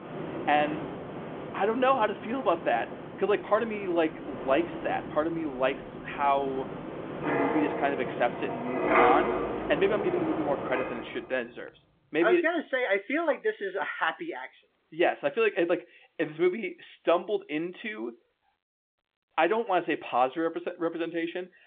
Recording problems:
phone-call audio
wind in the background; loud; until 11 s; 4 dB below the speech

